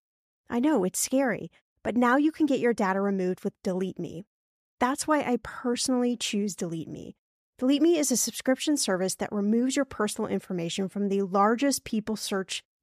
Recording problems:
none

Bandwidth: 14.5 kHz